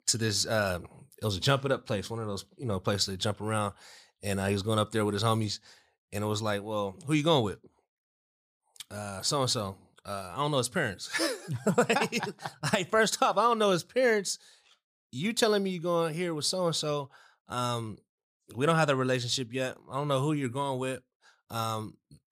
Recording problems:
none

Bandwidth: 15 kHz